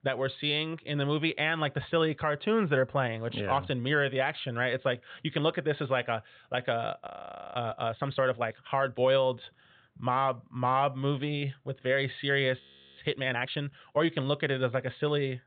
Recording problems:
high frequencies cut off; severe; nothing above 4 kHz
audio freezing; at 7 s and at 13 s

